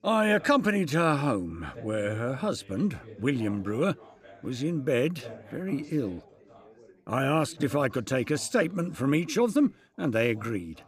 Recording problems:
background chatter; faint; throughout; 3 voices, 20 dB below the speech

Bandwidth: 15 kHz